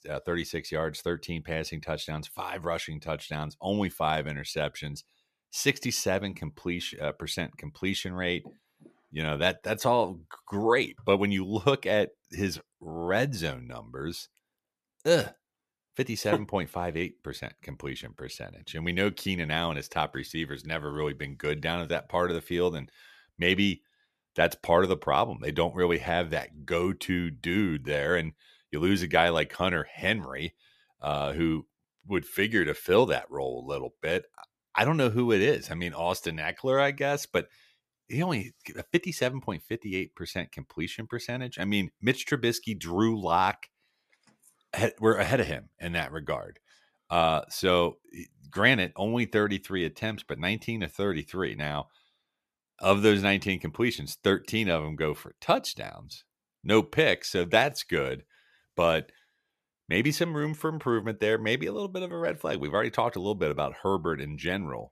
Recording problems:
none

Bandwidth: 14.5 kHz